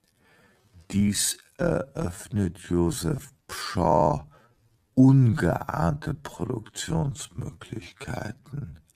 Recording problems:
wrong speed, natural pitch; too slow; 0.5 times normal speed

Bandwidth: 15 kHz